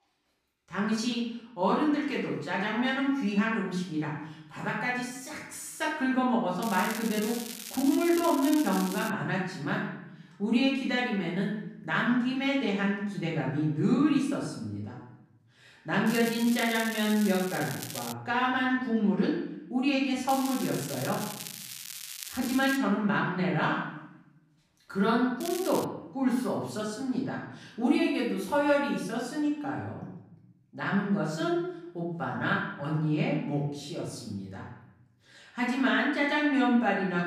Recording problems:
off-mic speech; far
room echo; noticeable; dies away in 0.8 s
crackling; noticeable; 4 times, first at 6.5 s; 10 dB below the speech

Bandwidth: 14.5 kHz